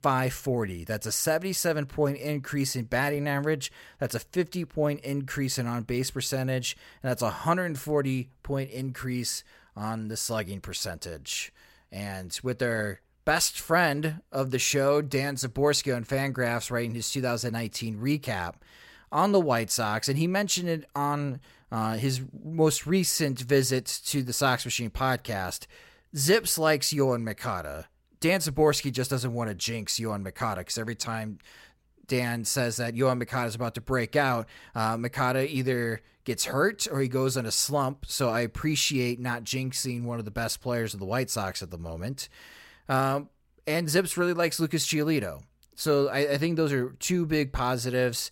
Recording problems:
none

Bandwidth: 16 kHz